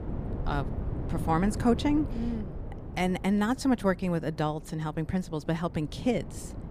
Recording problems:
wind noise on the microphone; occasional gusts; 15 dB below the speech

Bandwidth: 15 kHz